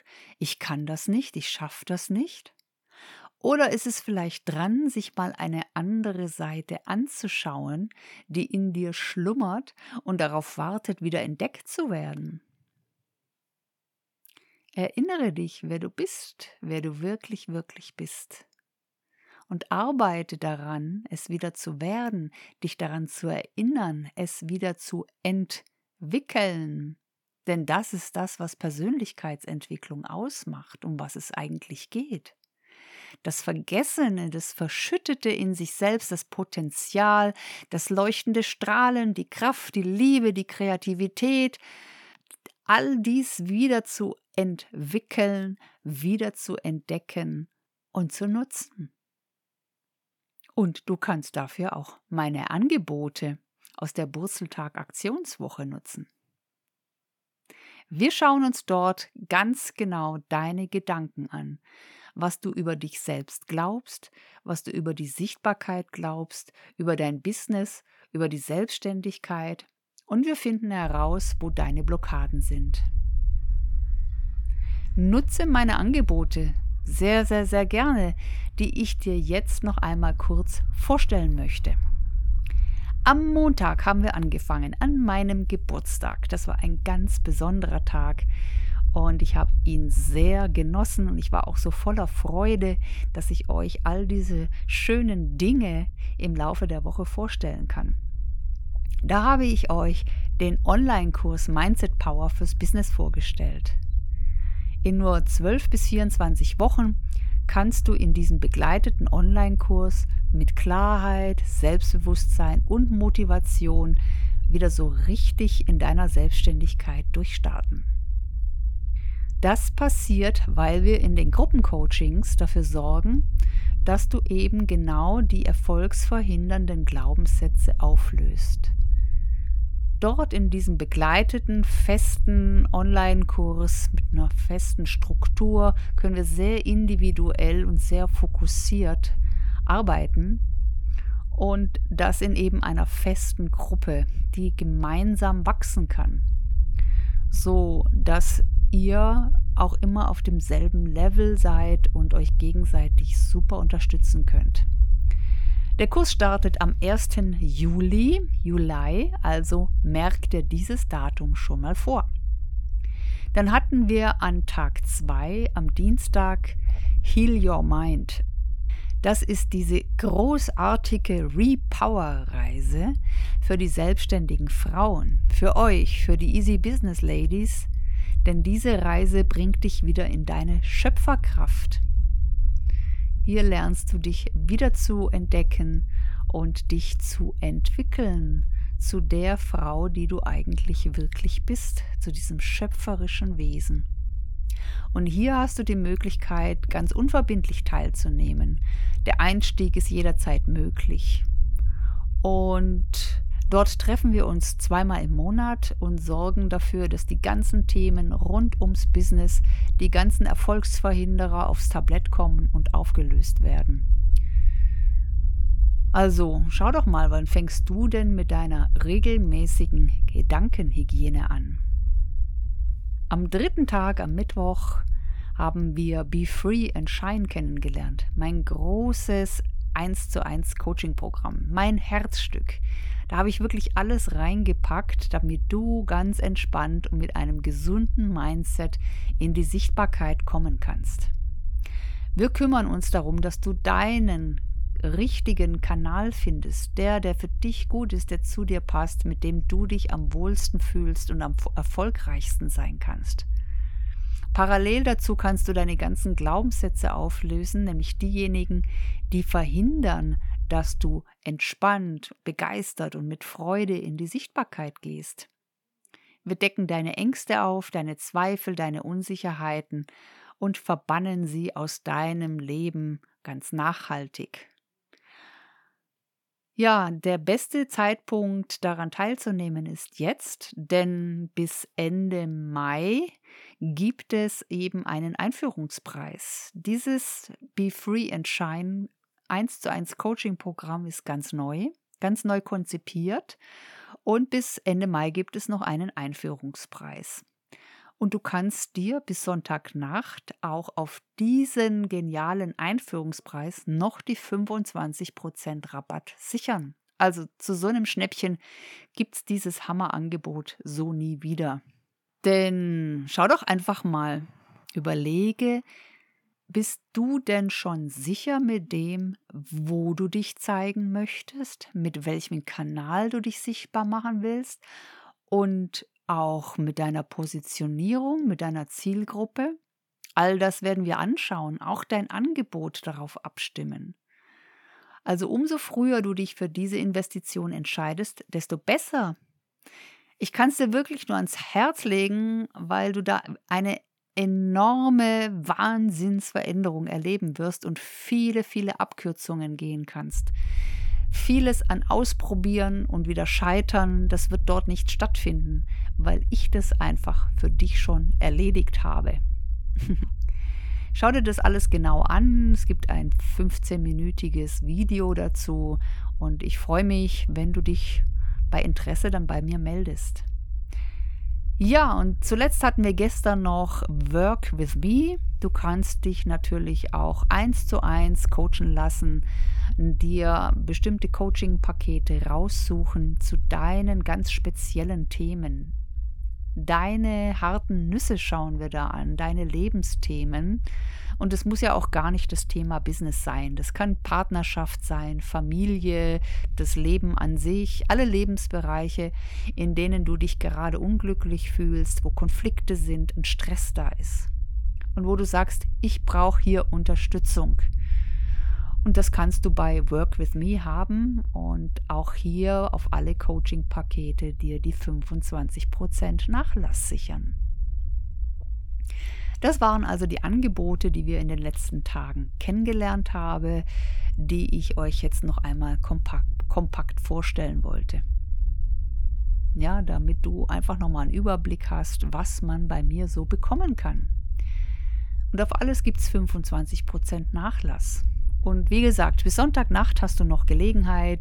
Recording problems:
low rumble; faint; from 1:11 to 4:21 and from 5:50 on; 20 dB below the speech

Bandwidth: 18.5 kHz